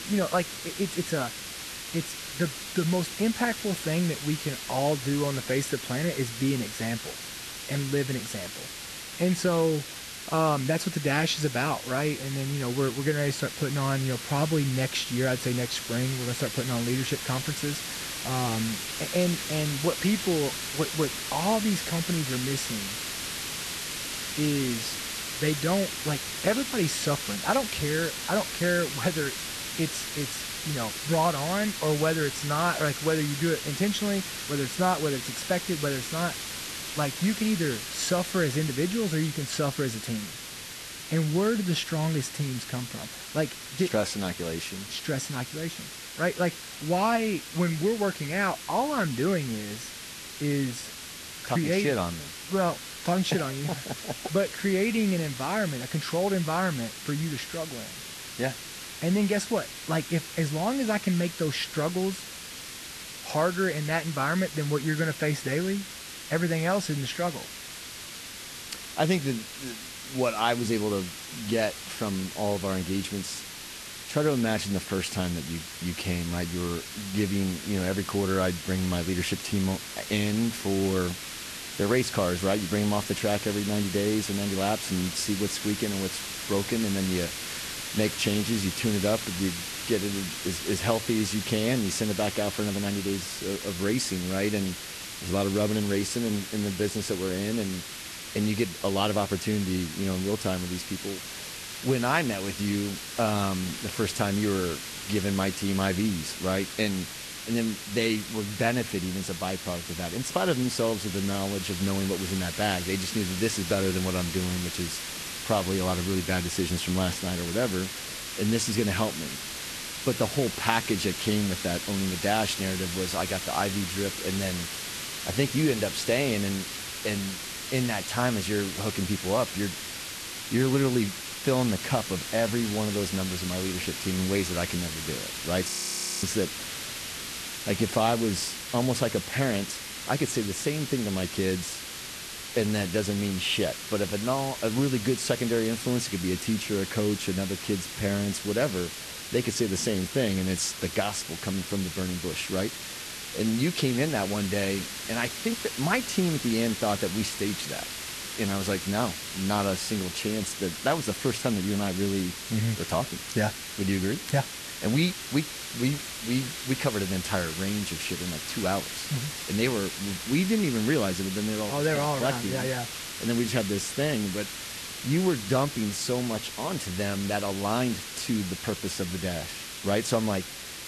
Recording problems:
garbled, watery; slightly; nothing above 13 kHz
hiss; loud; throughout; 6 dB below the speech
audio freezing; at 2:16 for 0.5 s

